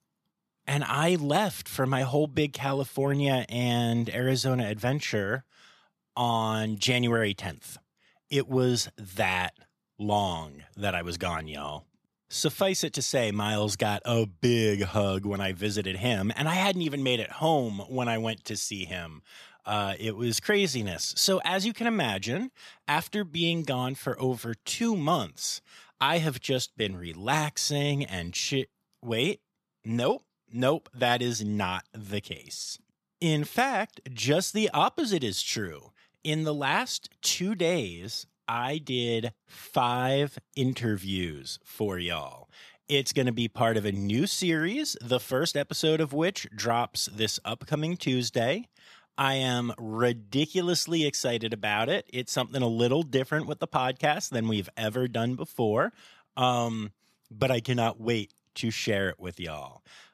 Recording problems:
none

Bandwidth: 14 kHz